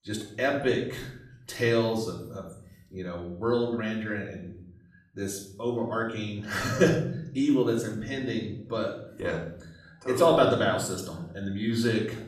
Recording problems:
off-mic speech; far
room echo; noticeable; dies away in 0.7 s

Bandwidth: 14.5 kHz